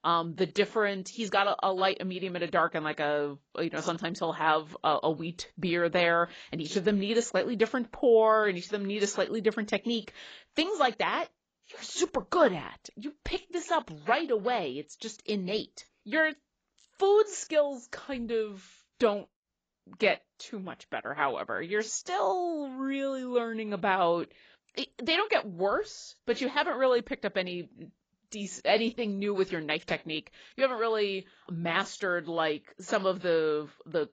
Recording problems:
garbled, watery; badly; nothing above 7.5 kHz

